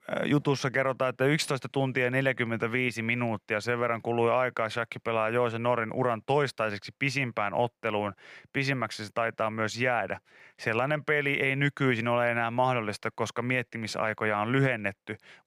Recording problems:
none

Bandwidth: 15 kHz